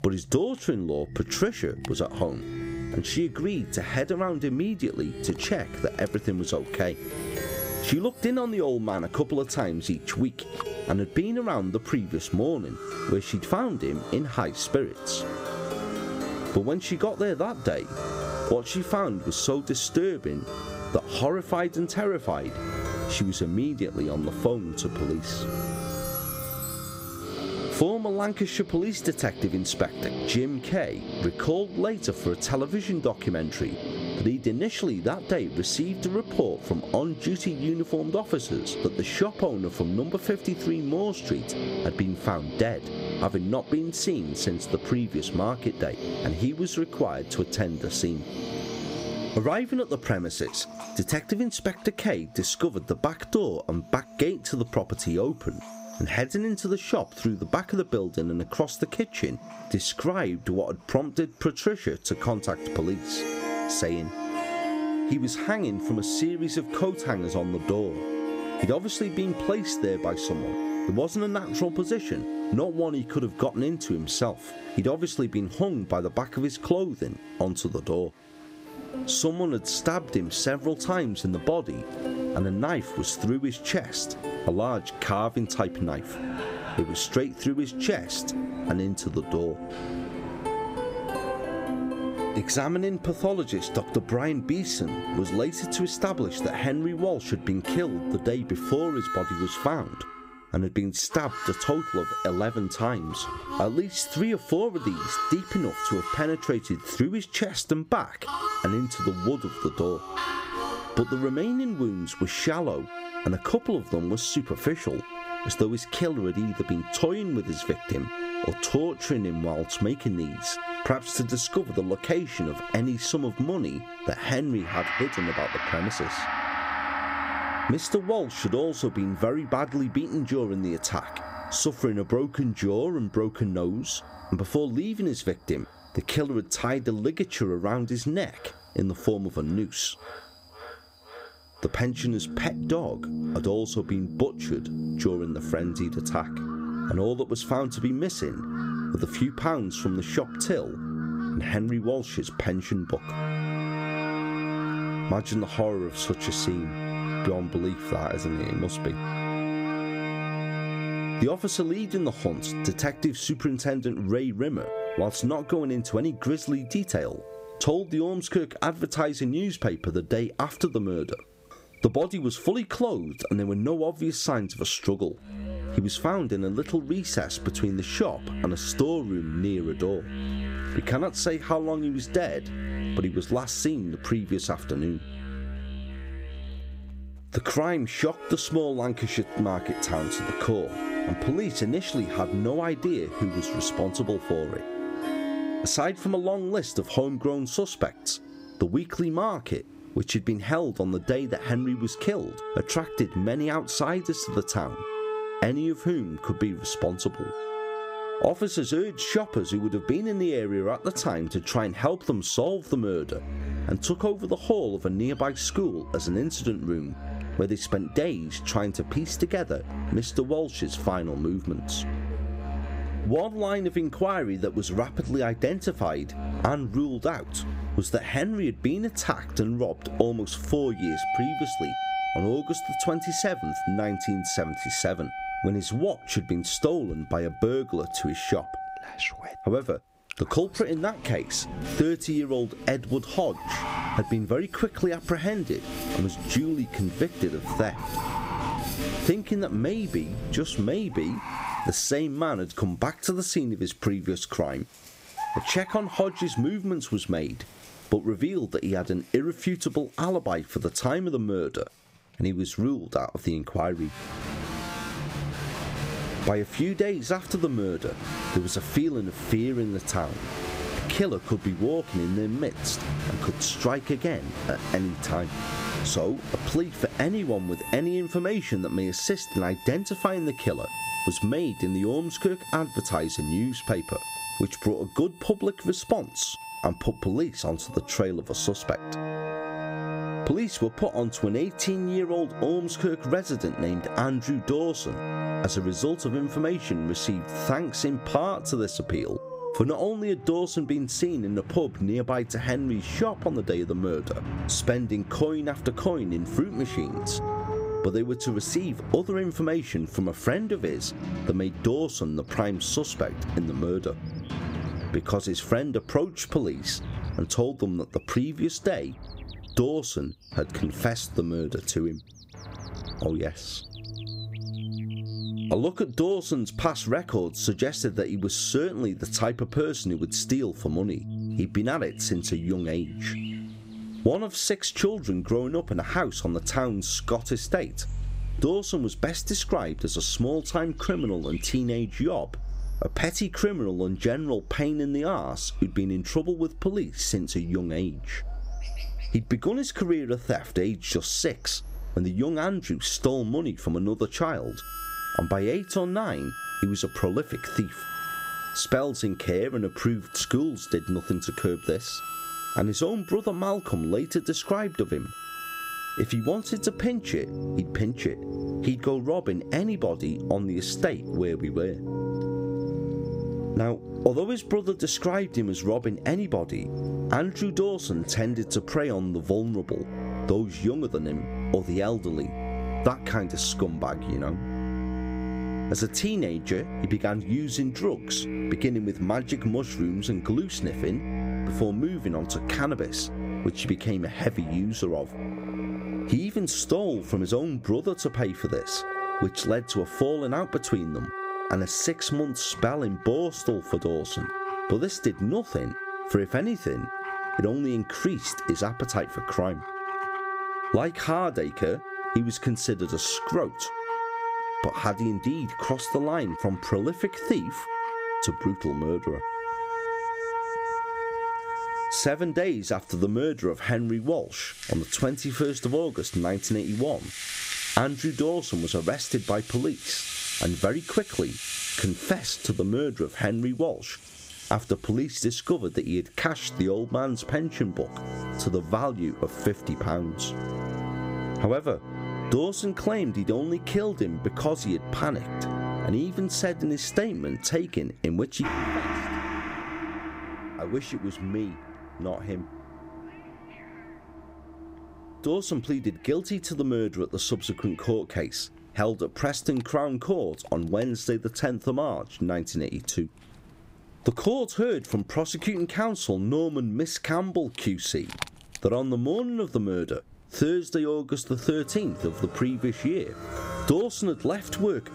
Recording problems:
squashed, flat; somewhat, background pumping
background music; loud; throughout; 8 dB below the speech
animal sounds; noticeable; throughout; 20 dB below the speech

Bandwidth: 15.5 kHz